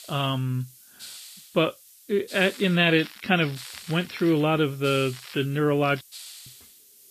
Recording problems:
garbled, watery; slightly; nothing above 5.5 kHz
hiss; noticeable; throughout; 20 dB below the speech
crackling; very faint; from 2.5 to 4.5 s, at 5 s and at 6 s; 20 dB below the speech
audio cutting out; at 6 s

